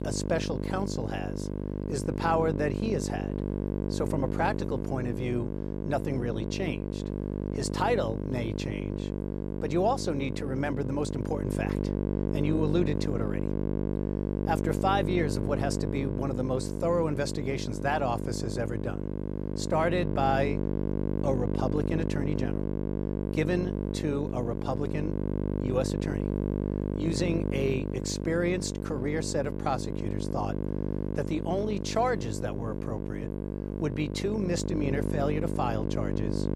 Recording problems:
electrical hum; loud; throughout; 50 Hz, 5 dB below the speech

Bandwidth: 15 kHz